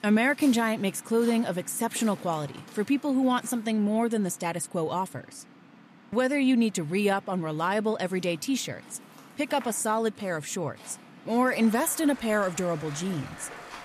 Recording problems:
rain or running water; noticeable; throughout; 20 dB below the speech

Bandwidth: 14.5 kHz